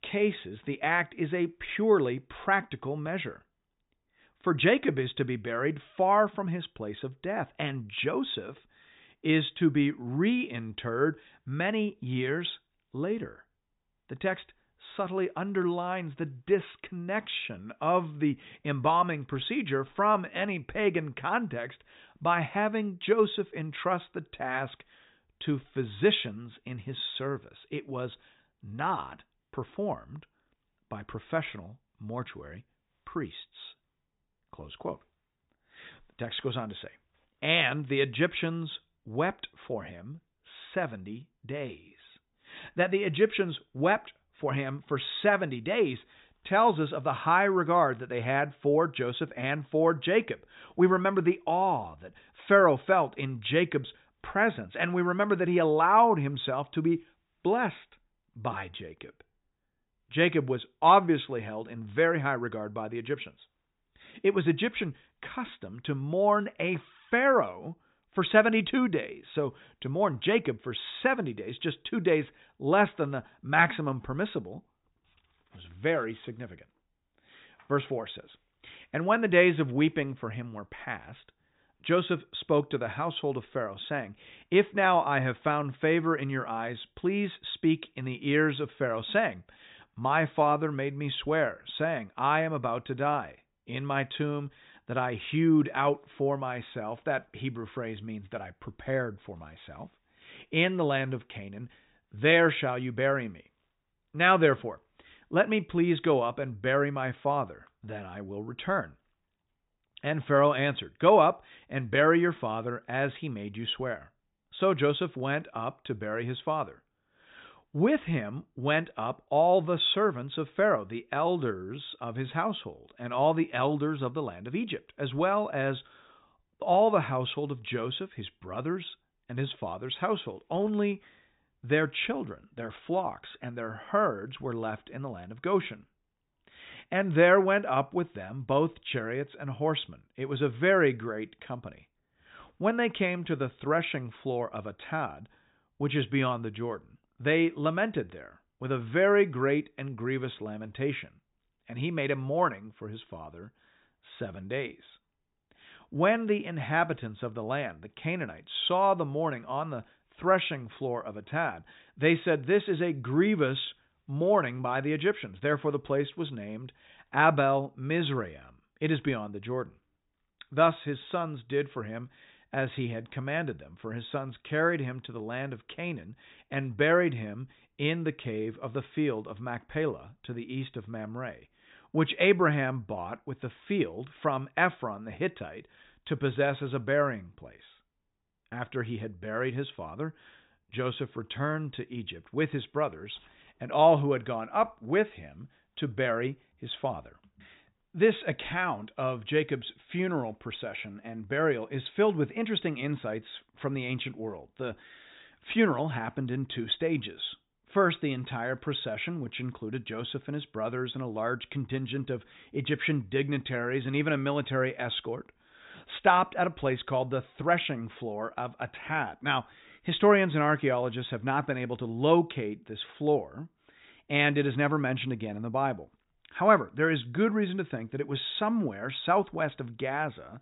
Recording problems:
high frequencies cut off; severe; nothing above 4 kHz

